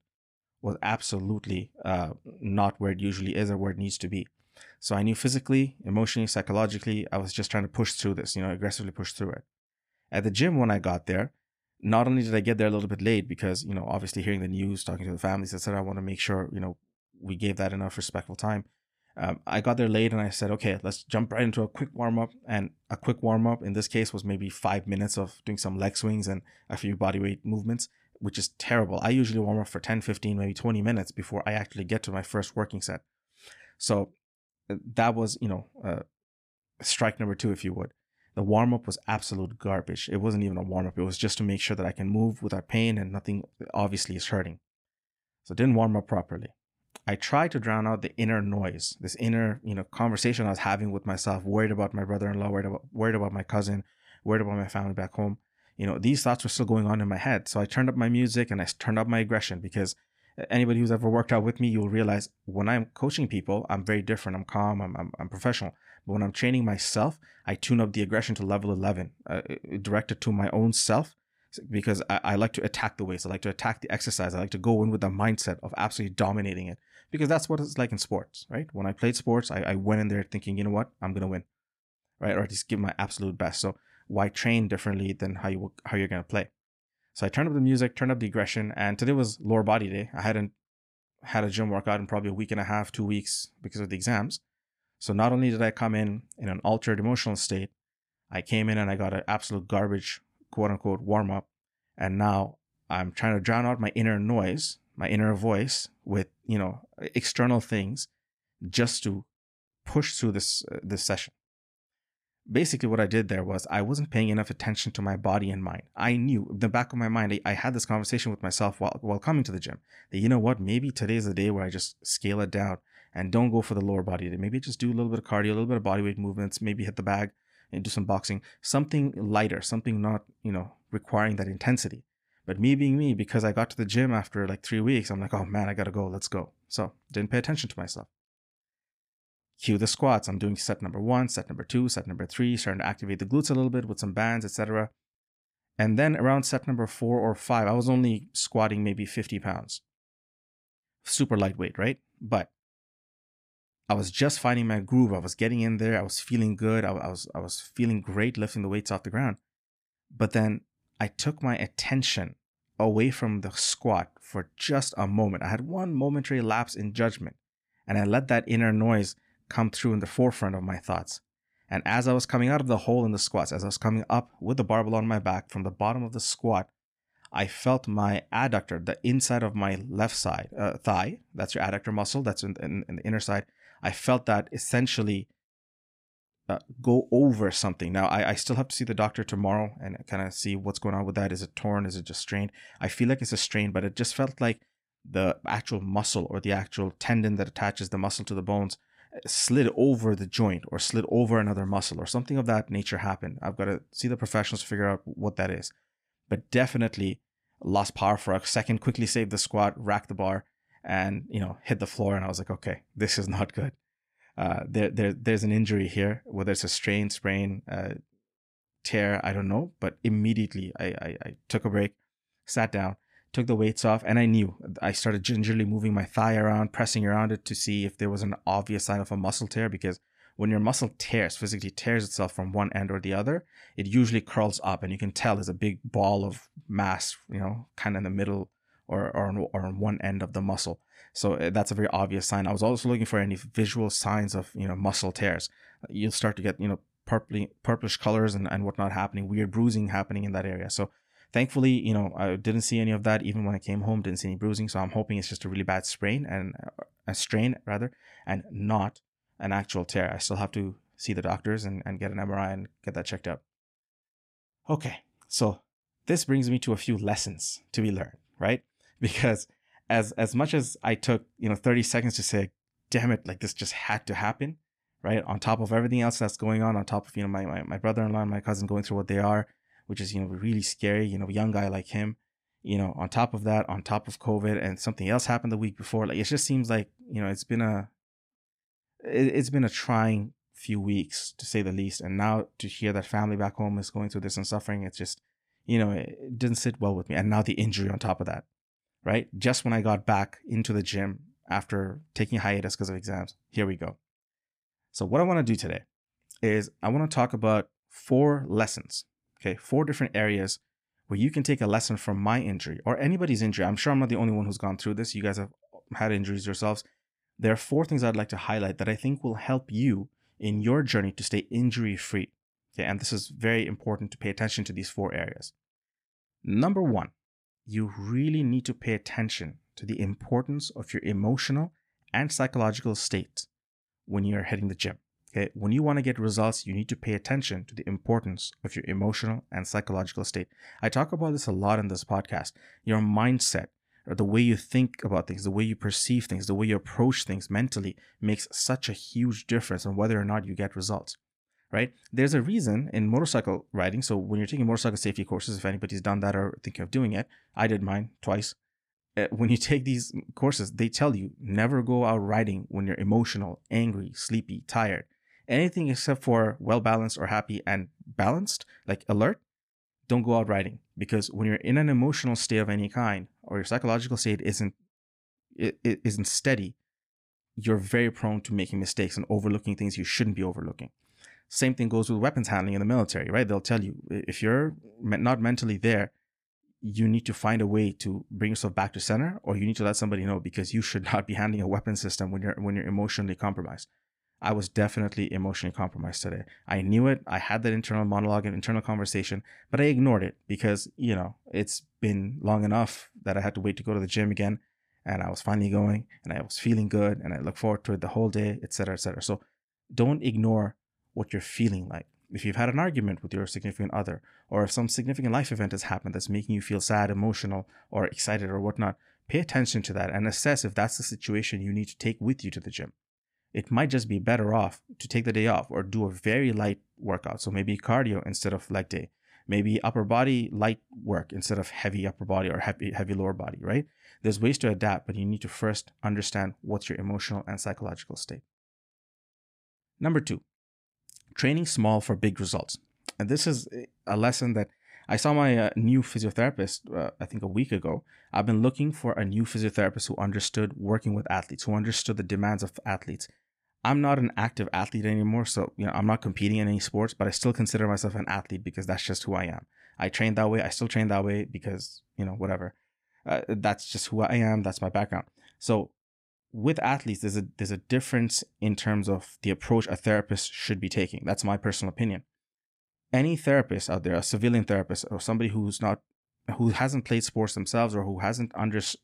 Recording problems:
none

